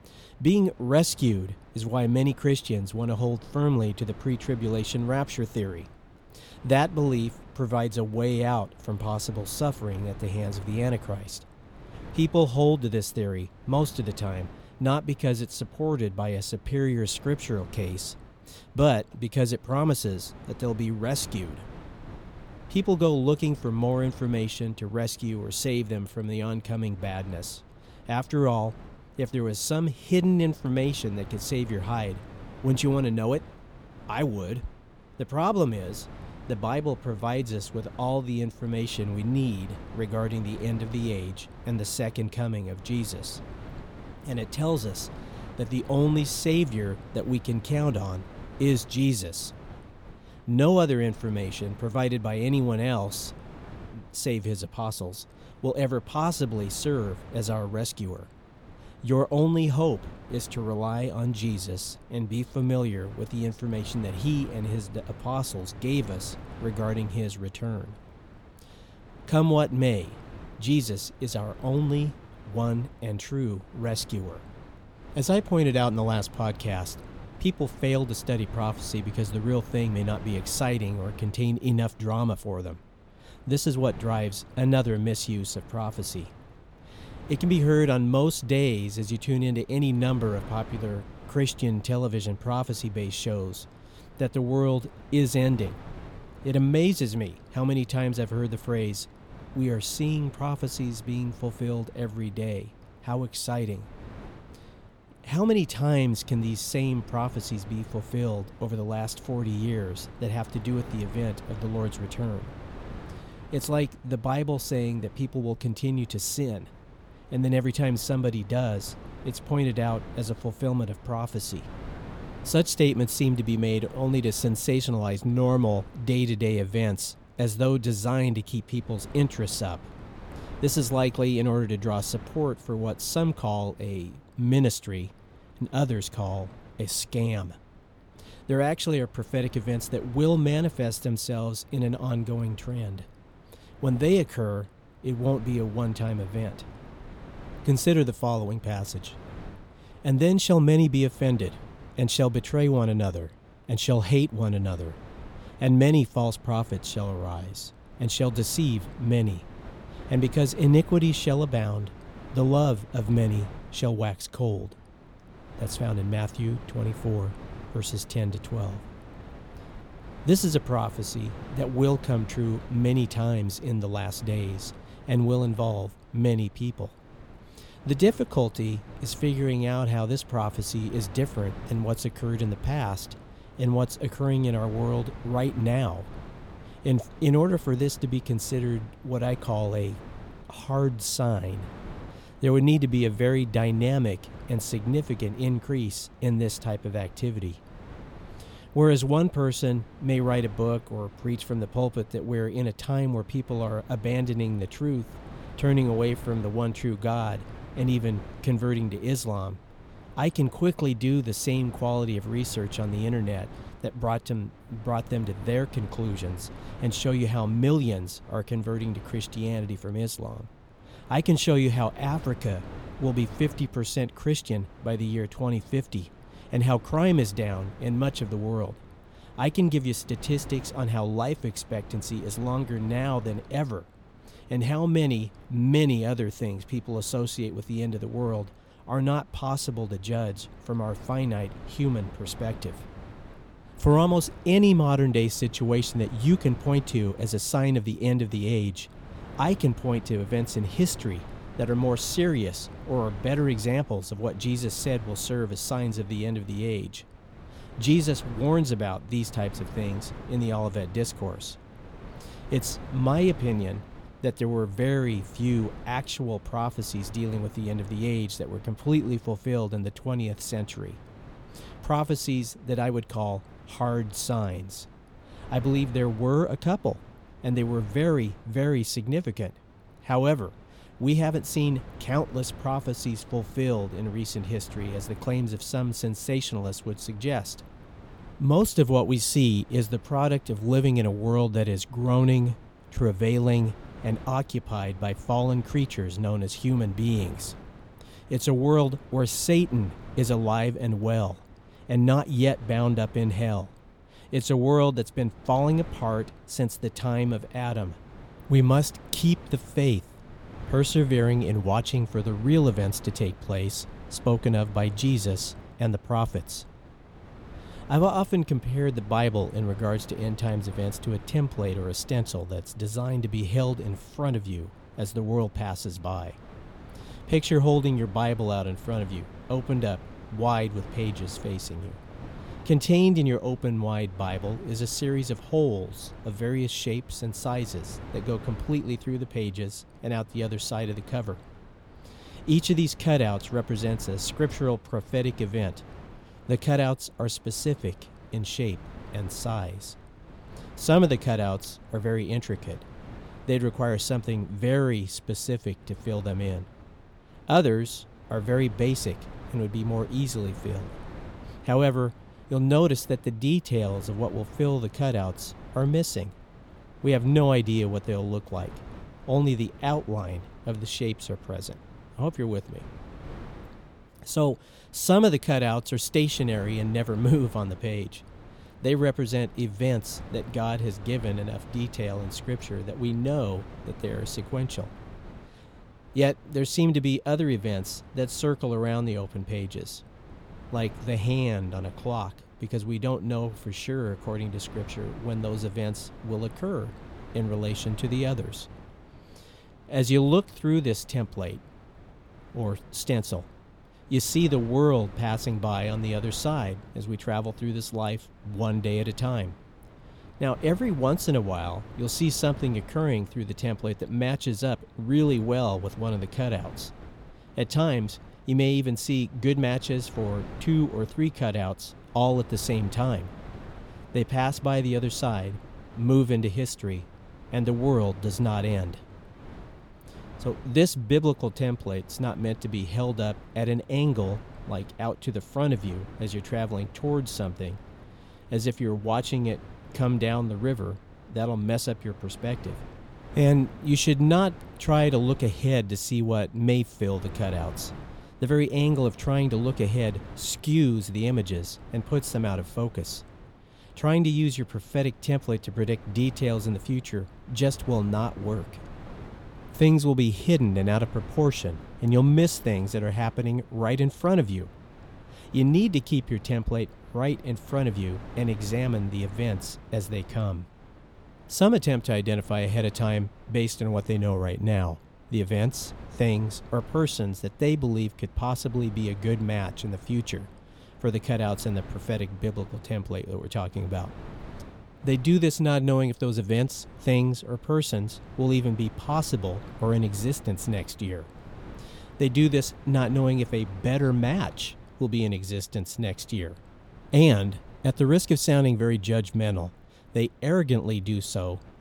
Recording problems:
wind noise on the microphone; occasional gusts; 20 dB below the speech

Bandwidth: 18 kHz